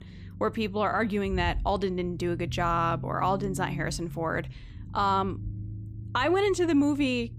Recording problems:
low rumble; faint; throughout; 20 dB below the speech

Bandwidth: 15 kHz